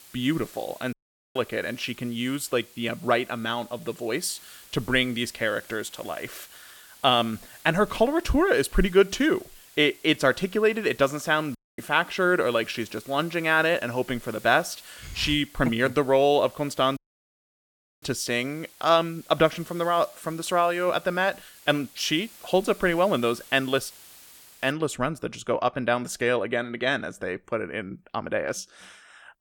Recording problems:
hiss; faint; until 25 s; 20 dB below the speech
audio cutting out; at 1 s, at 12 s and at 17 s for 1 s

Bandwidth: 18 kHz